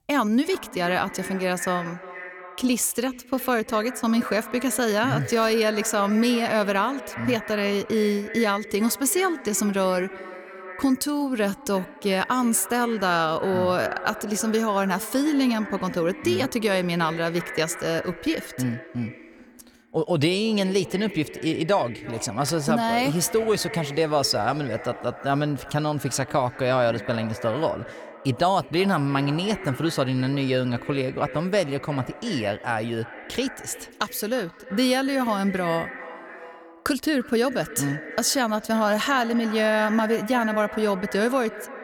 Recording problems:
echo of what is said; noticeable; throughout; 340 ms later, 15 dB below the speech

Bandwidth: 18.5 kHz